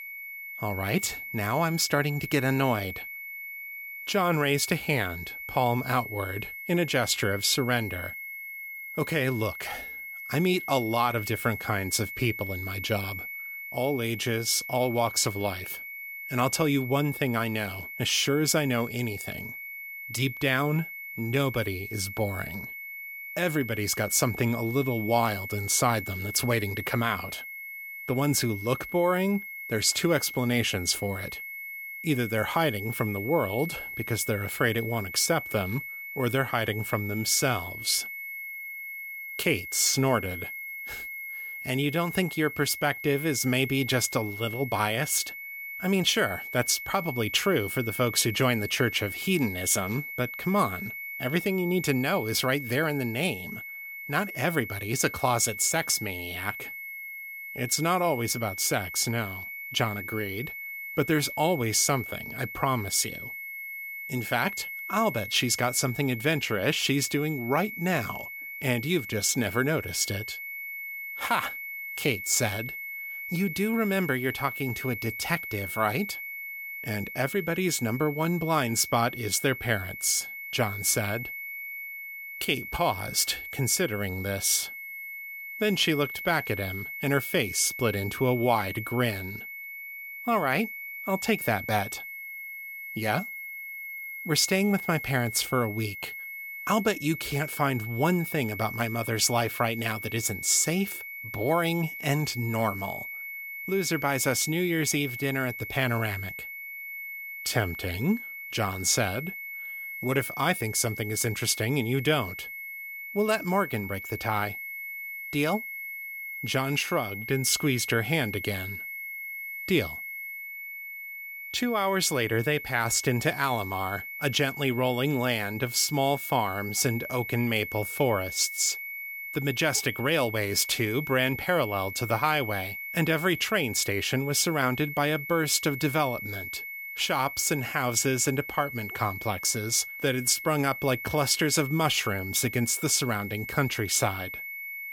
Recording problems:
high-pitched whine; loud; throughout; 2 kHz, 9 dB below the speech

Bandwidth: 17 kHz